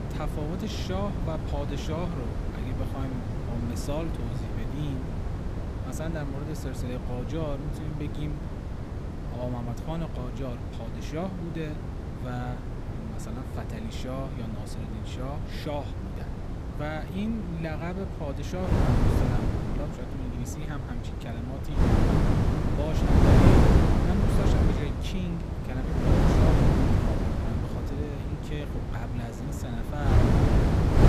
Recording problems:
wind noise on the microphone; heavy; 3 dB above the speech

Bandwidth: 15 kHz